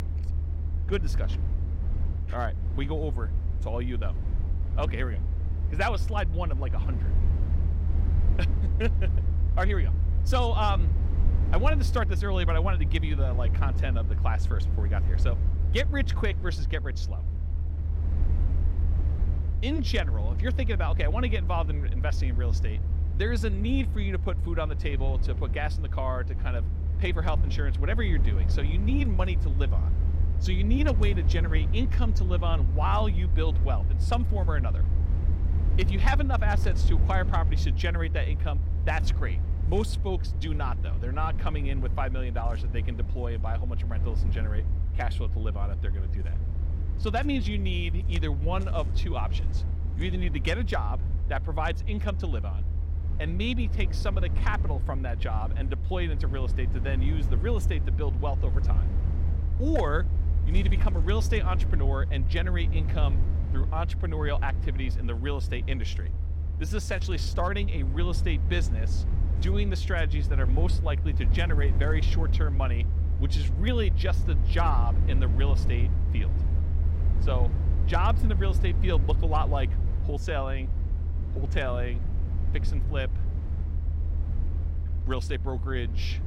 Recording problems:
low rumble; noticeable; throughout; 10 dB below the speech

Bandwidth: 16.5 kHz